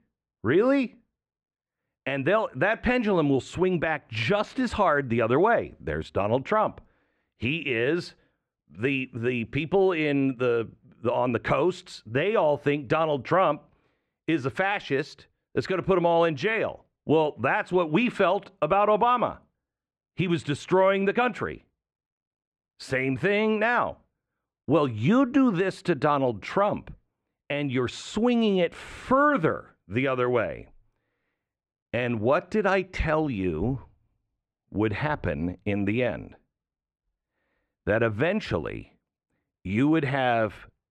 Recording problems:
muffled; very; fading above 2 kHz

